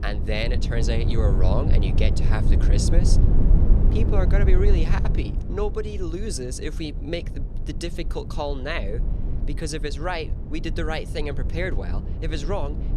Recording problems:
low rumble; loud; throughout; 7 dB below the speech

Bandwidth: 14 kHz